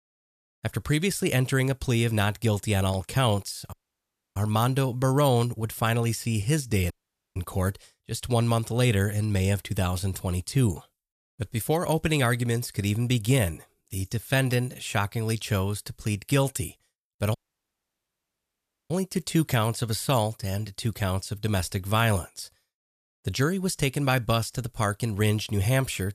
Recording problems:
audio cutting out; at 3.5 s for 0.5 s, at 7 s and at 17 s for 1.5 s

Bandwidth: 14.5 kHz